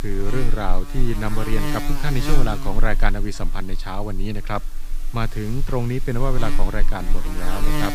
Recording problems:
electrical hum; loud; throughout; 60 Hz, 5 dB below the speech

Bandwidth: 15 kHz